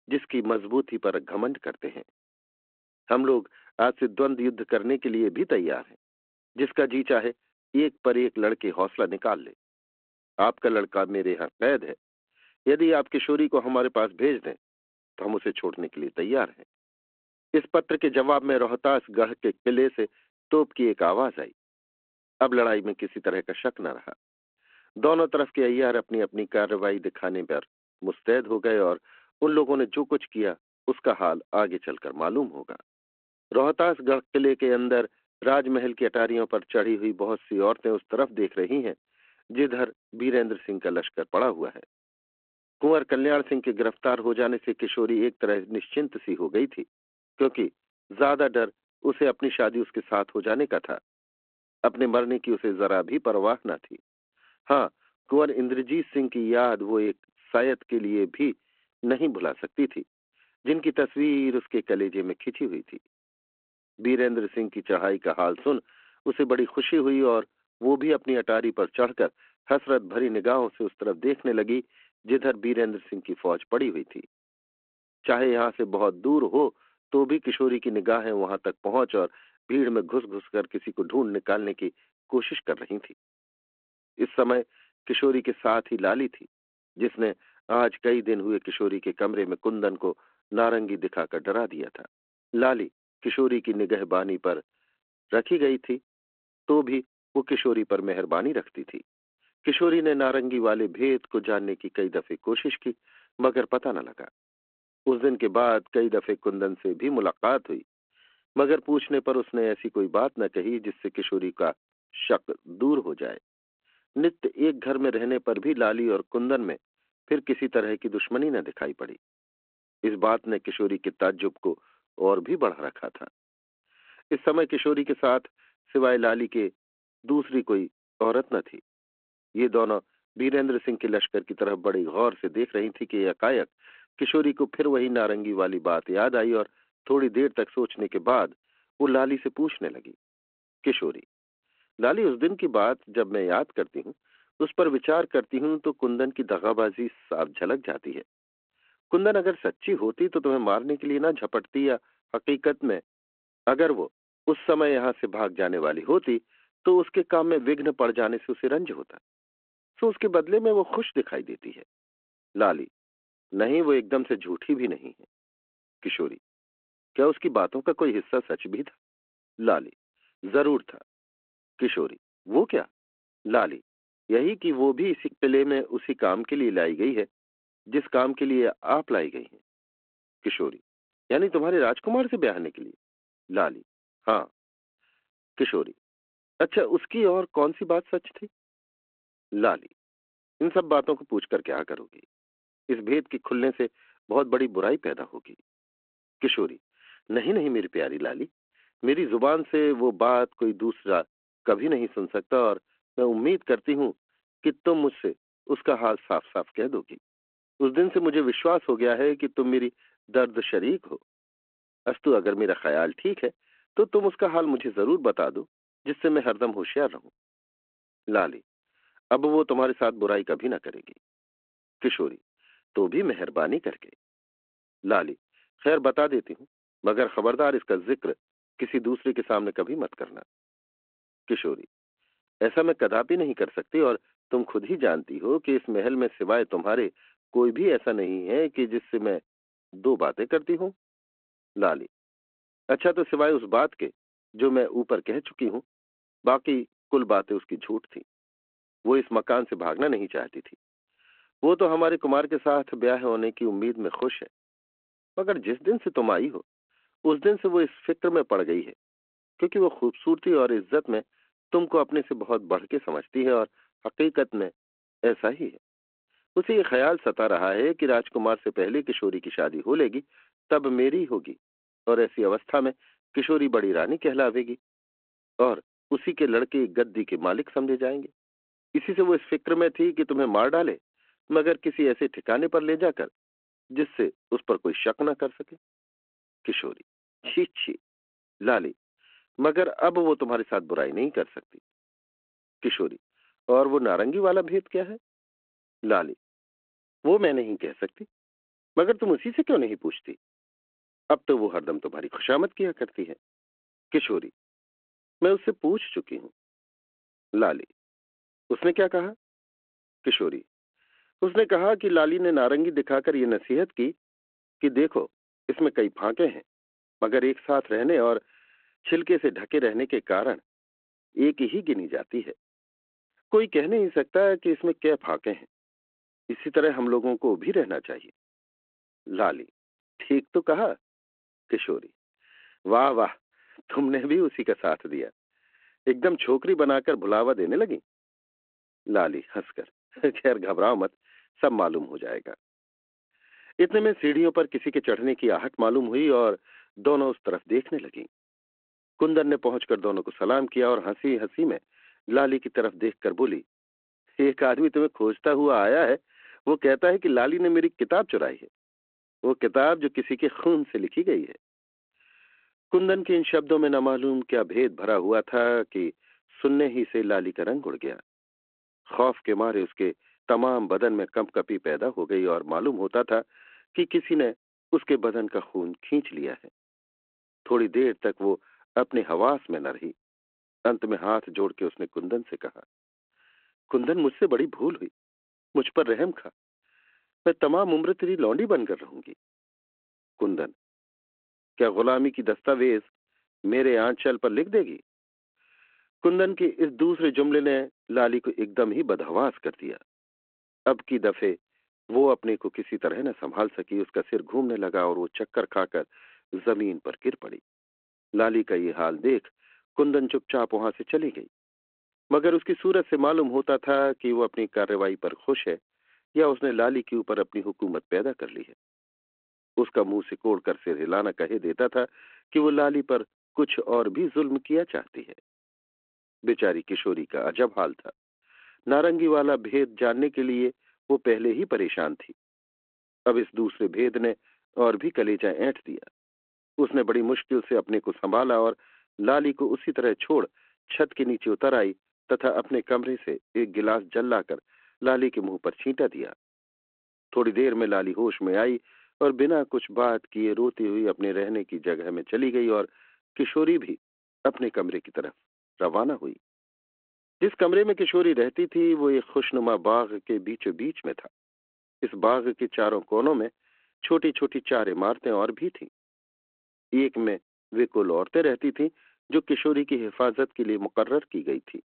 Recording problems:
phone-call audio

